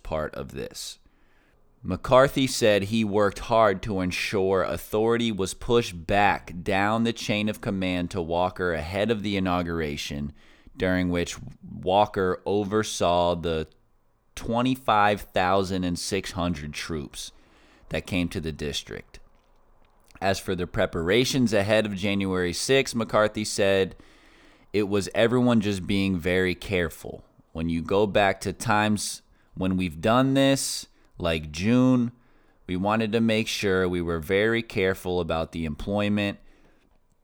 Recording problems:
none

